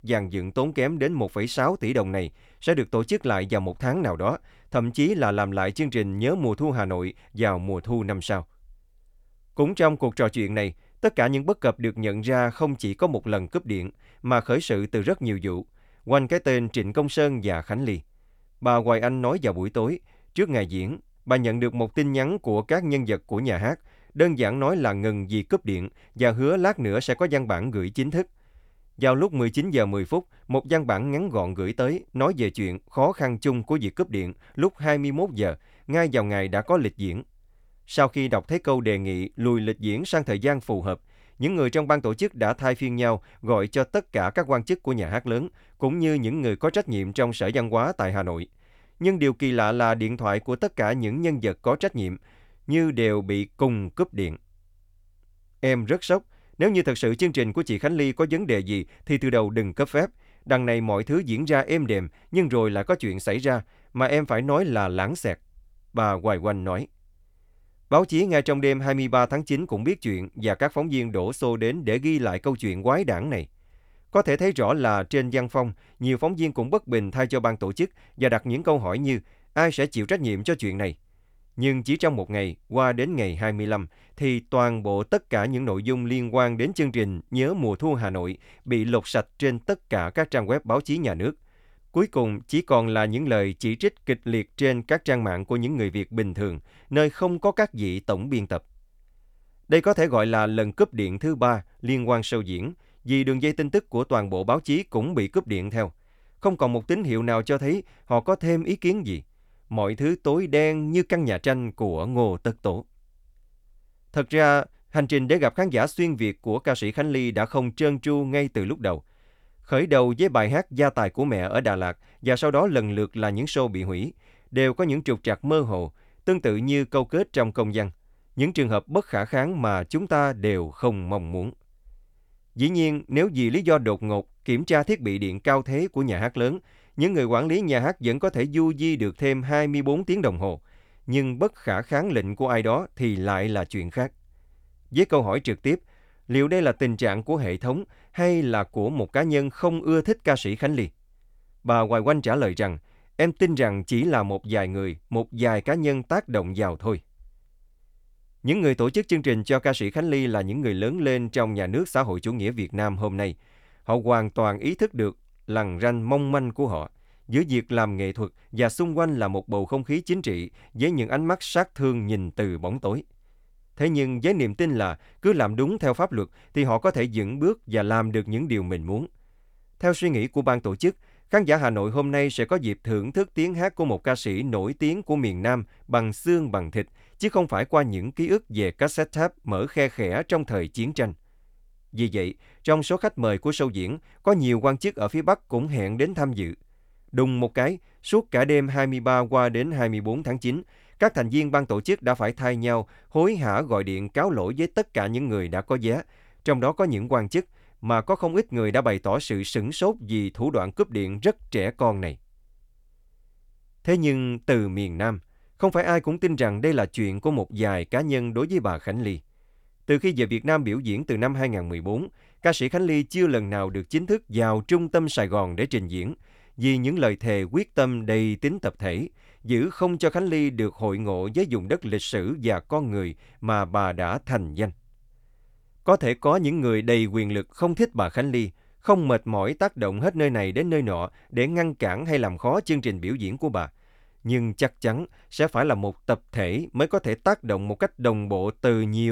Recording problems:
abrupt cut into speech; at the end

